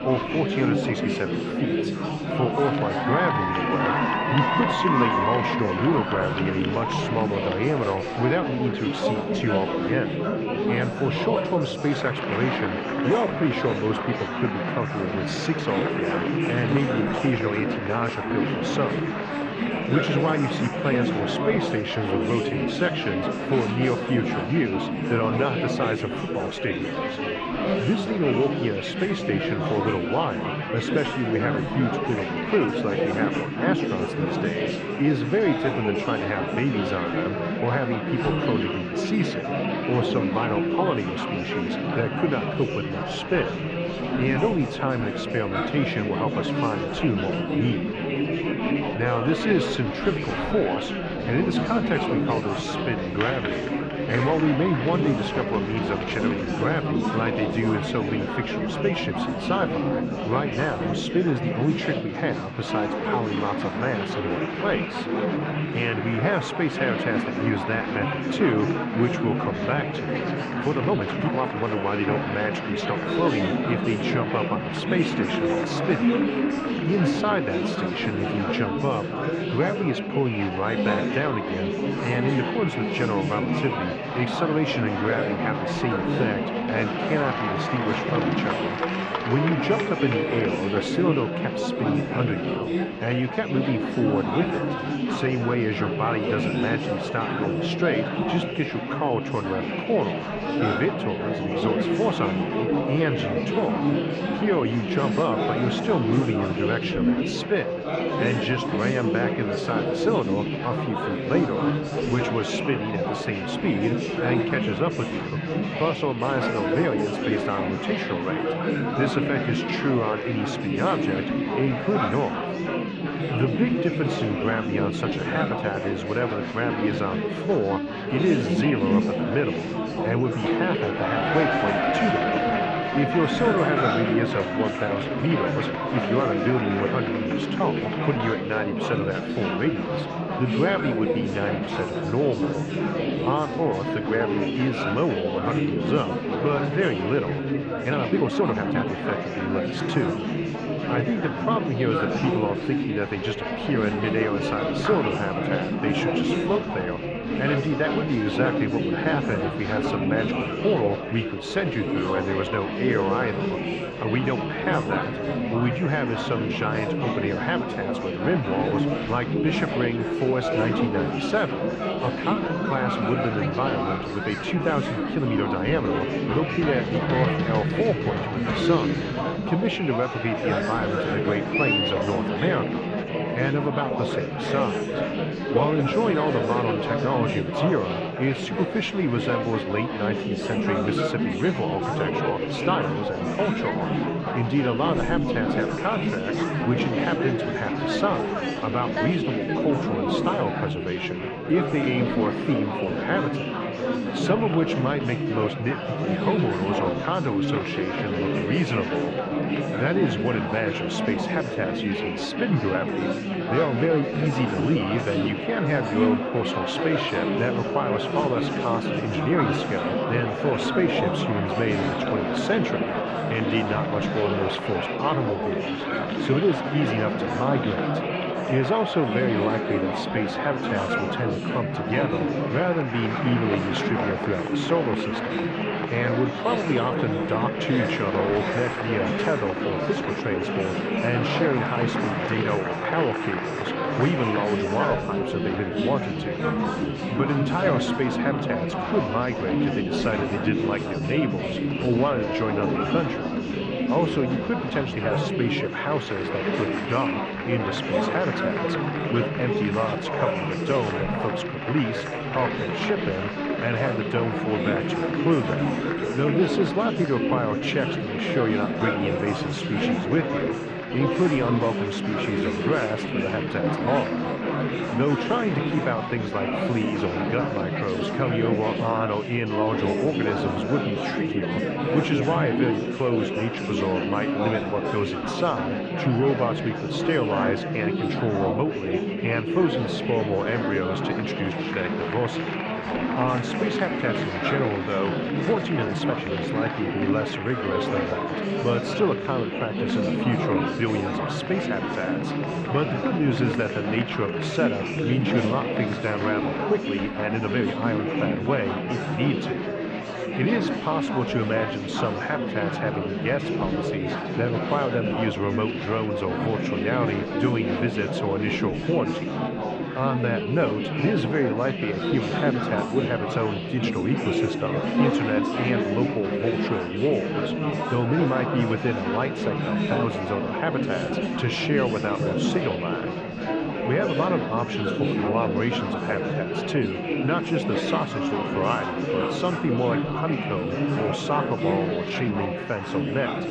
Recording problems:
muffled; slightly; fading above 3.5 kHz
chatter from many people; very loud; throughout; 1 dB above the speech
high-pitched whine; noticeable; throughout; 2.5 kHz, 20 dB below the speech
uneven, jittery; strongly; from 1:11 to 4:56

